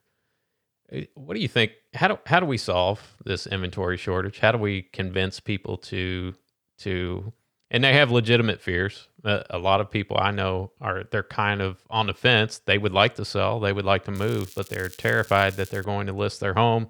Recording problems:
crackling; faint; from 14 to 16 s; 20 dB below the speech

